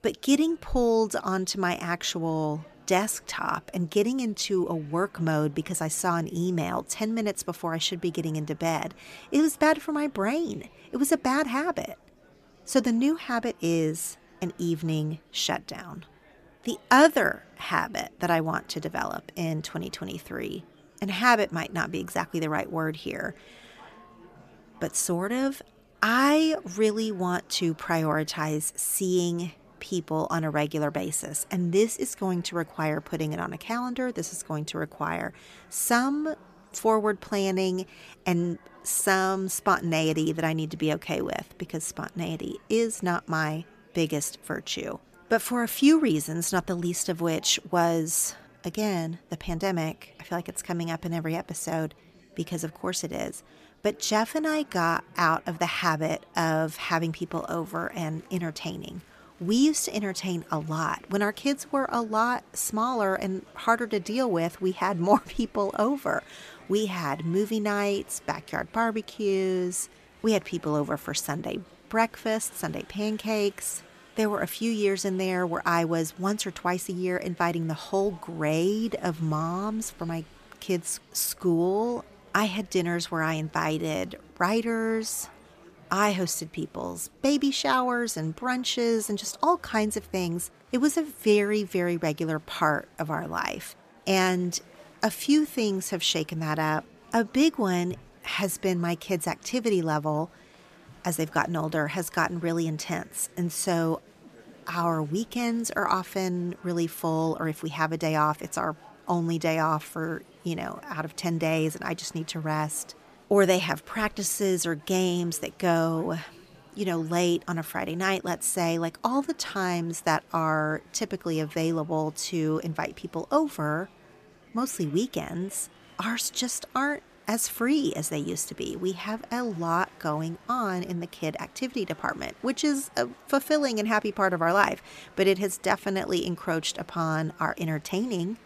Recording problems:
murmuring crowd; faint; throughout; 25 dB below the speech

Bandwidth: 14.5 kHz